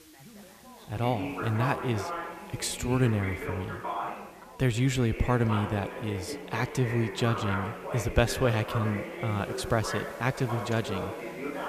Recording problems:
echo of what is said; noticeable; throughout; 110 ms later, 15 dB below the speech
background chatter; loud; throughout; 4 voices, 7 dB below the speech
hiss; faint; throughout; 25 dB below the speech

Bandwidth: 14.5 kHz